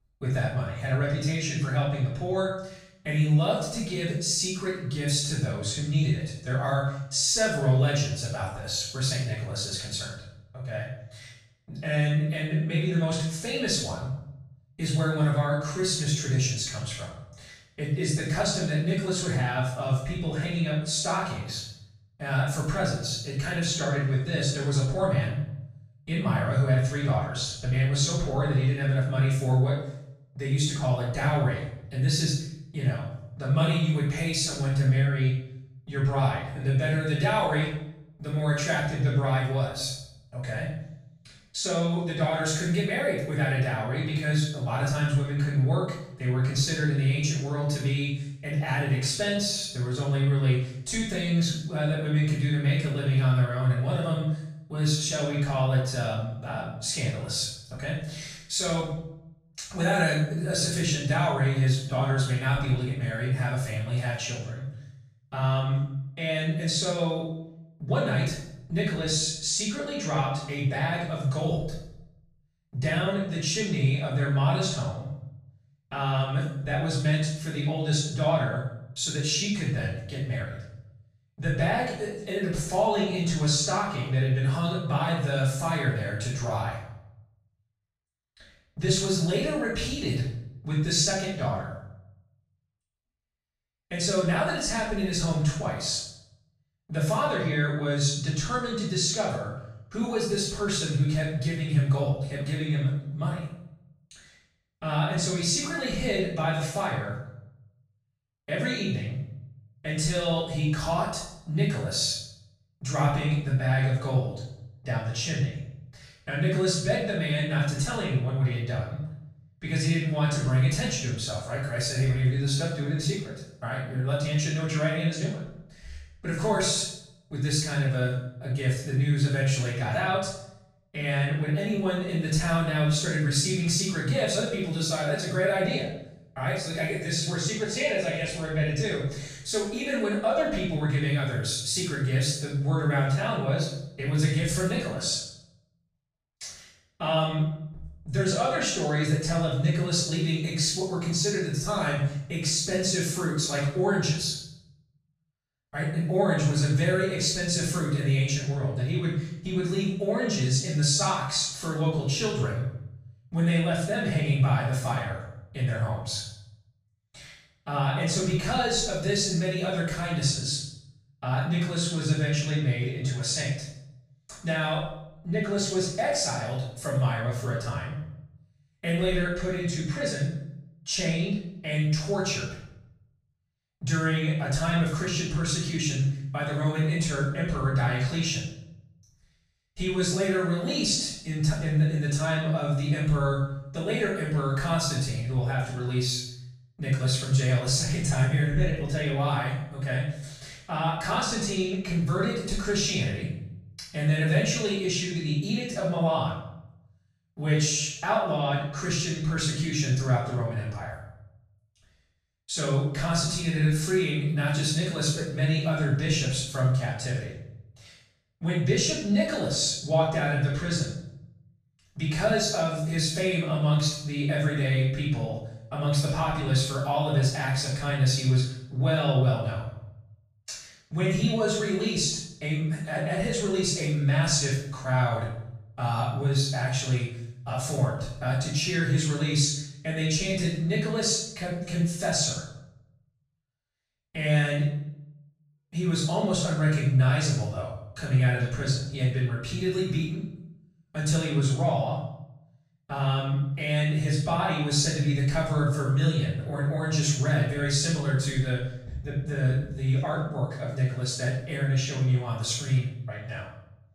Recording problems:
off-mic speech; far
room echo; noticeable; dies away in 0.7 s

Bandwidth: 15 kHz